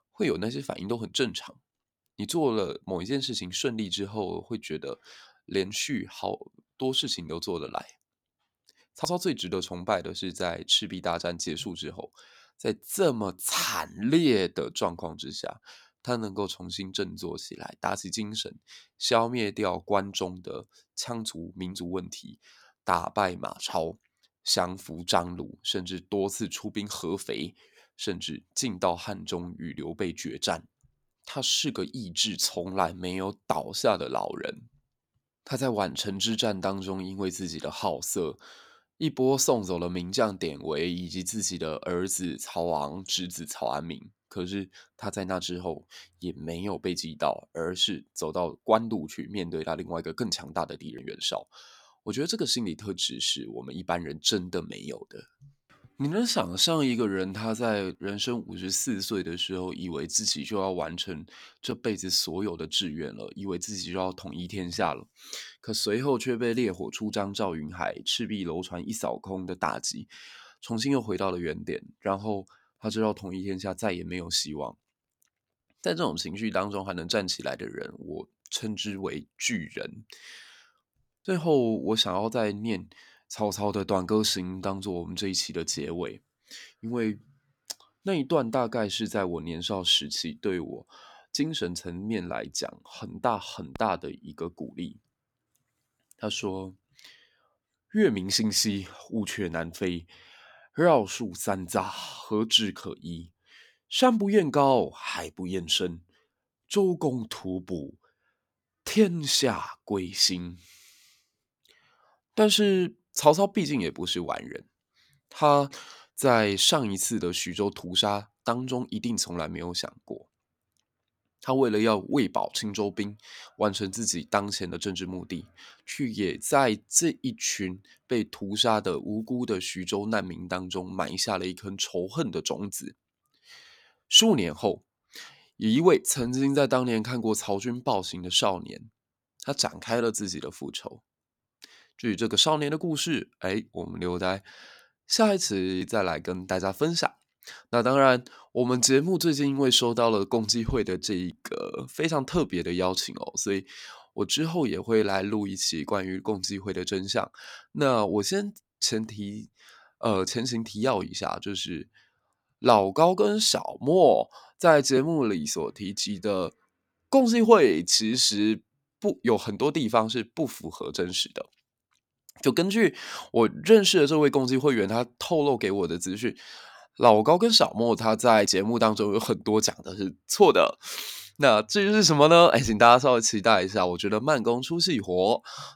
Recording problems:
none

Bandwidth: 18 kHz